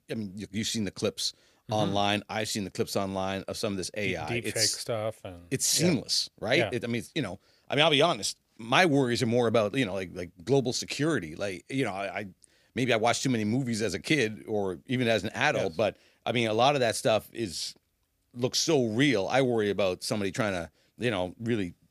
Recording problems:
none

